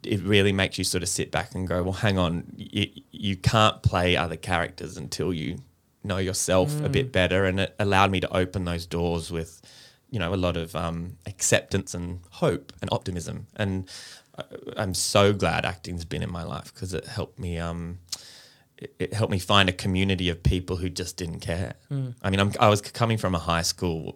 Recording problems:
uneven, jittery; strongly; from 0.5 to 22 s

